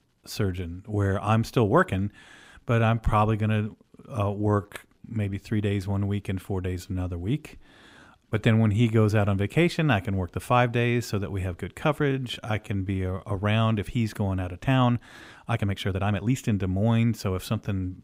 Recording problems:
uneven, jittery; strongly; from 2.5 to 16 s

